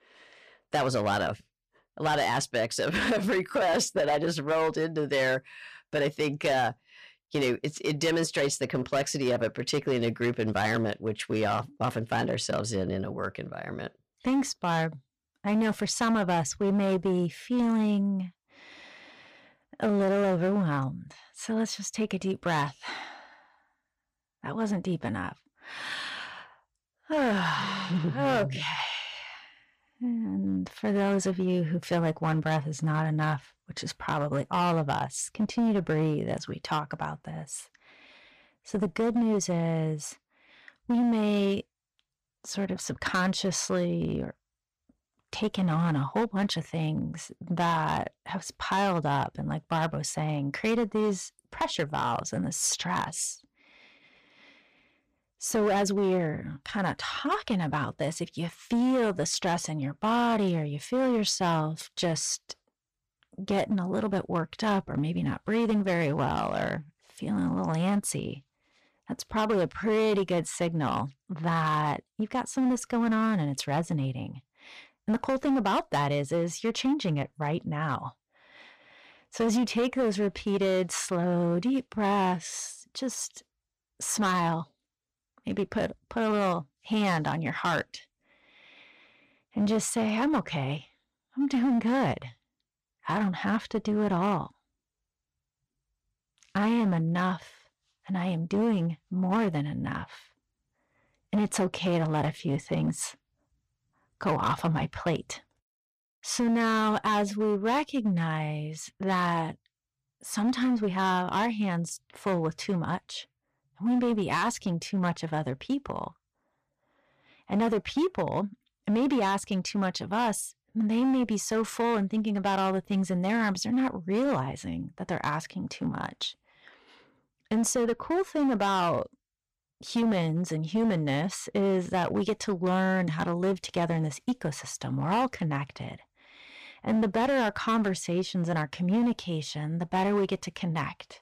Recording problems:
distortion; slight; 8% of the sound clipped

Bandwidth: 14.5 kHz